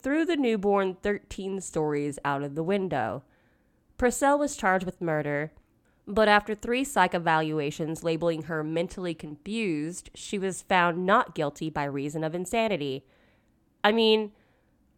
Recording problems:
none

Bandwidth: 17 kHz